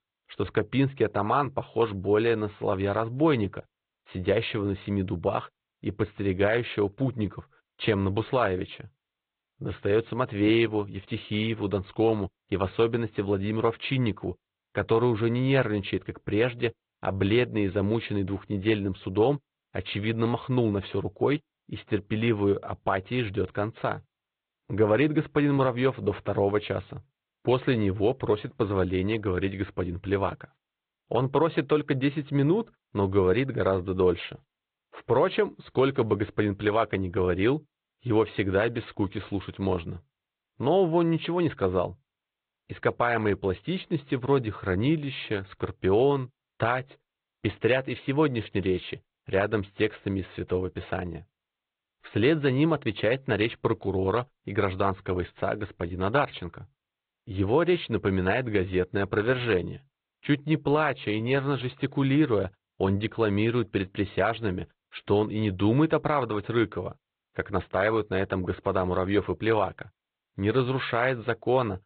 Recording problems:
high frequencies cut off; severe; nothing above 4 kHz
garbled, watery; slightly

